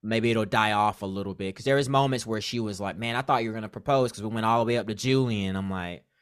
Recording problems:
none

